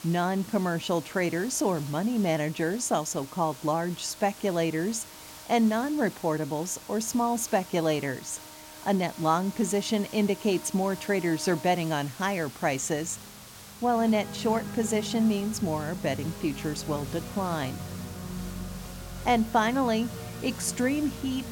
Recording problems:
background music; noticeable; throughout; 15 dB below the speech
hiss; noticeable; throughout; 15 dB below the speech

